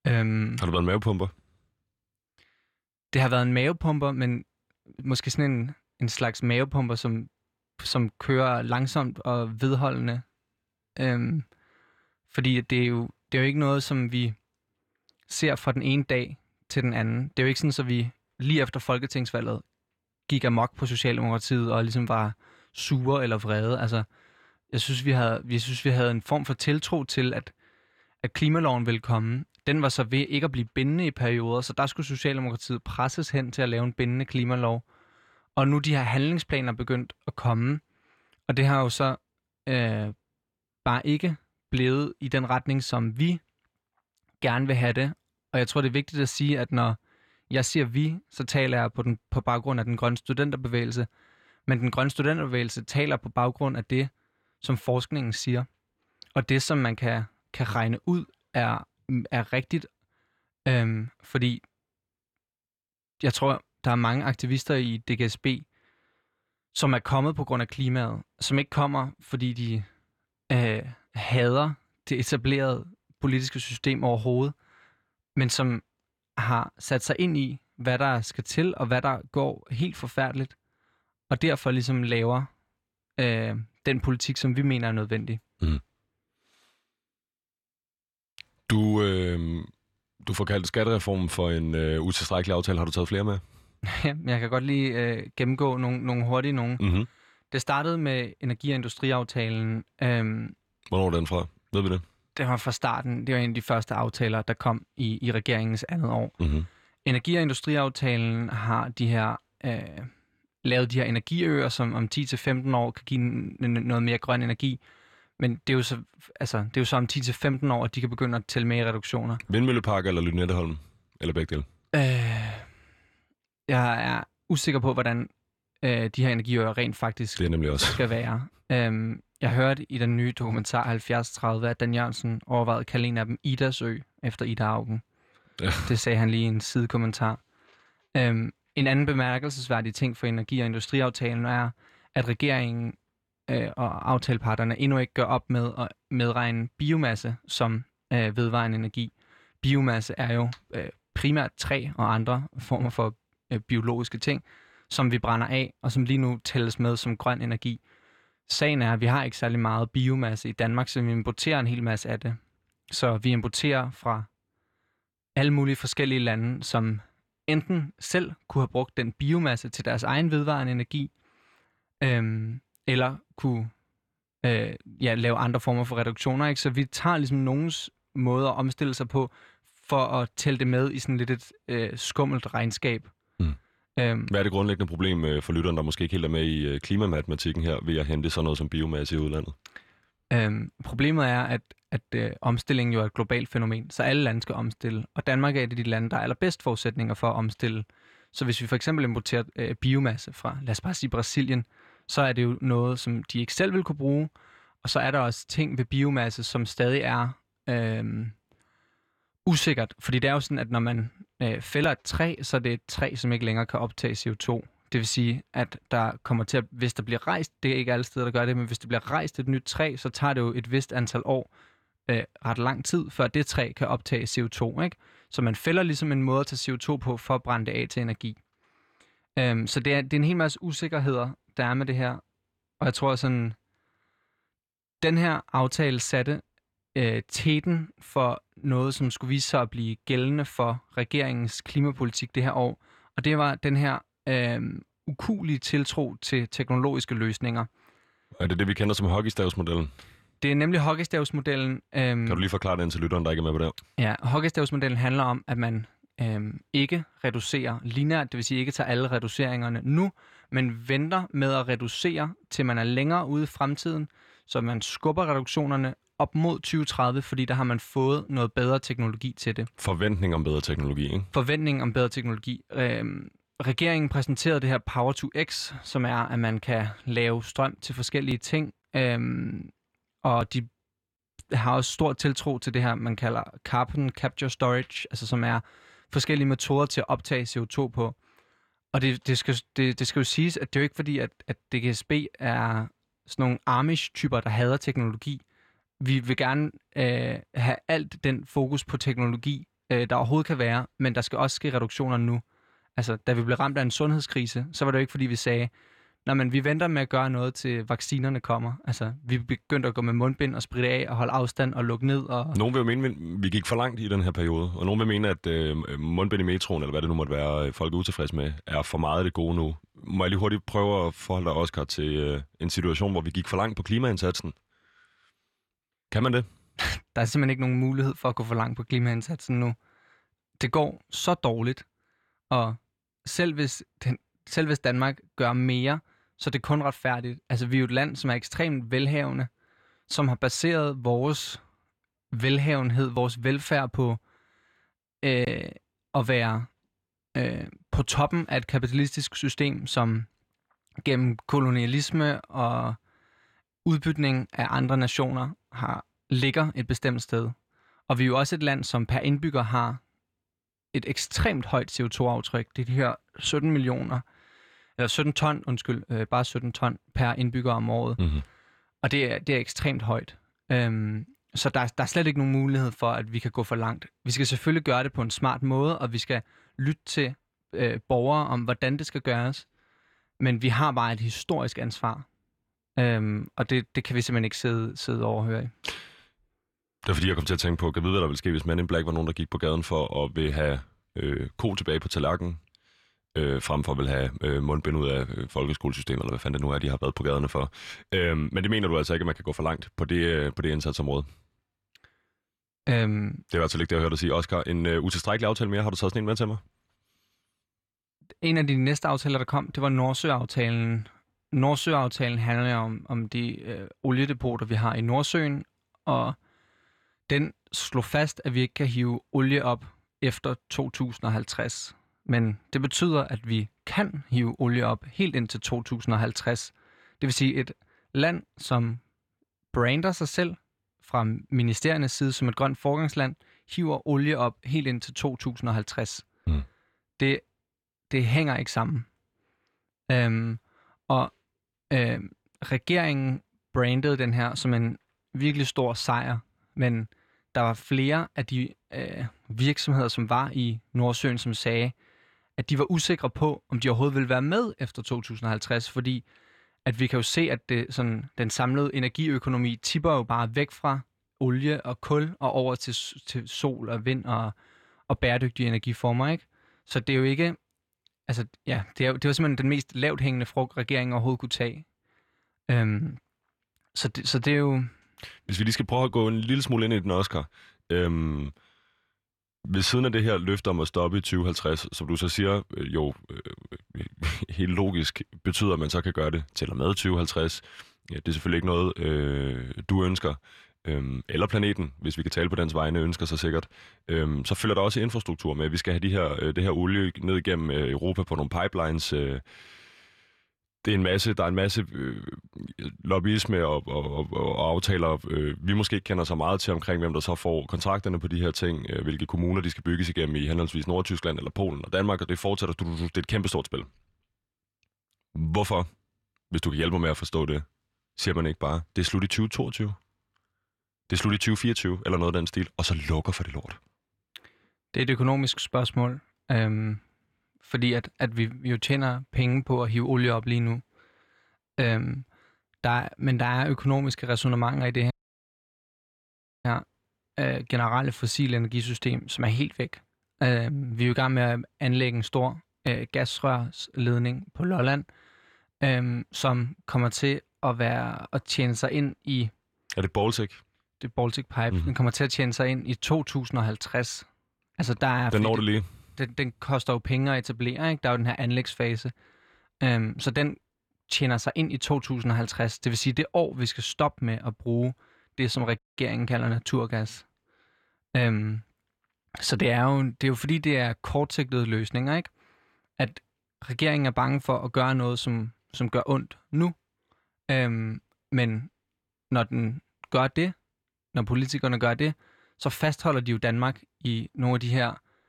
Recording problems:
audio cutting out; at 8:55 for 1.5 s and at 9:26

